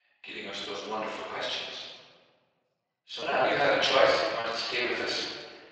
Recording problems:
room echo; strong; dies away in 1.4 s
off-mic speech; far
thin; very; fading below 750 Hz
garbled, watery; slightly
choppy; very; from 3 to 5 s; 11% of the speech affected

